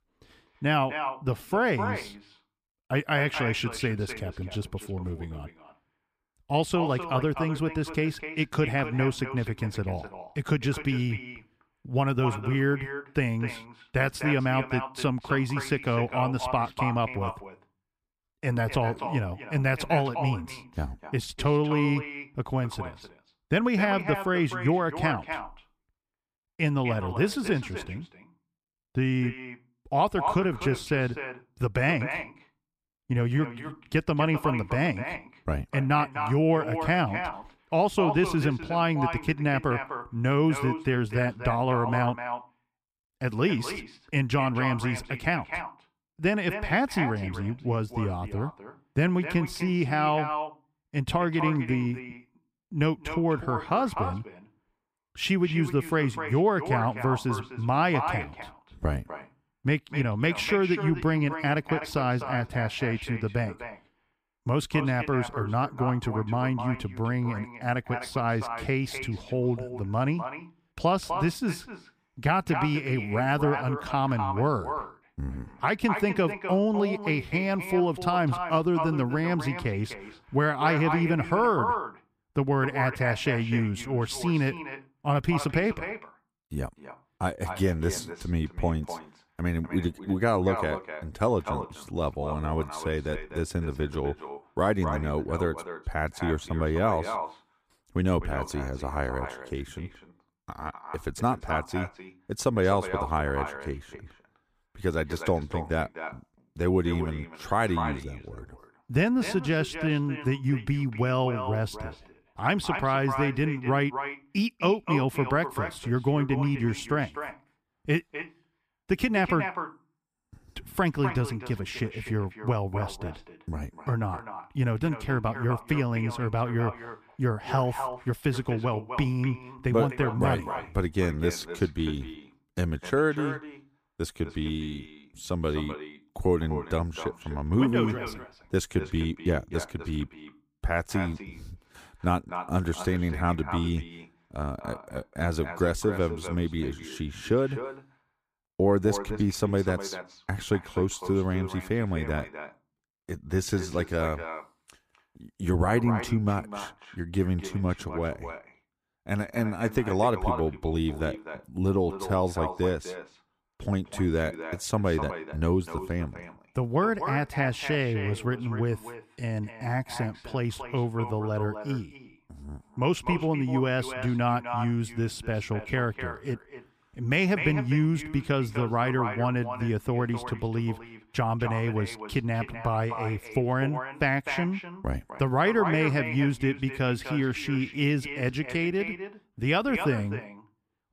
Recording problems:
echo of what is said; strong; throughout; 250 ms later, 9 dB below the speech

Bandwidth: 15 kHz